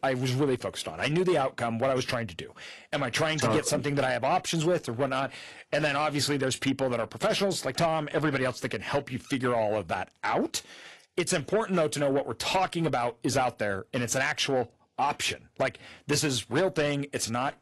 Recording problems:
distortion; slight; 10 dB below the speech
garbled, watery; slightly; nothing above 11.5 kHz

